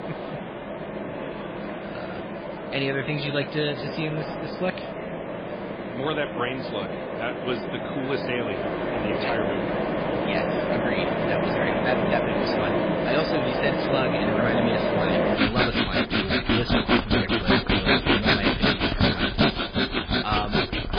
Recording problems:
garbled, watery; badly
machinery noise; very loud; throughout; 5 dB above the speech
murmuring crowd; noticeable; throughout; 15 dB below the speech

